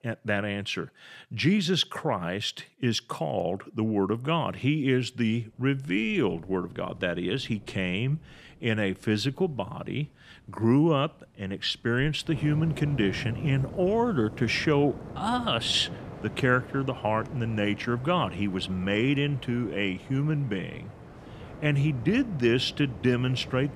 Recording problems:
rain or running water; noticeable; from 5.5 s on; 15 dB below the speech

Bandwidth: 14.5 kHz